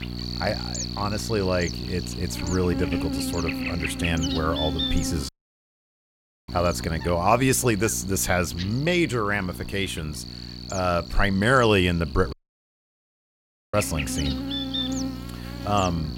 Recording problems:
electrical hum; loud; throughout; 60 Hz, 7 dB below the speech
audio cutting out; at 5.5 s for 1 s and at 12 s for 1.5 s

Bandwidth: 16 kHz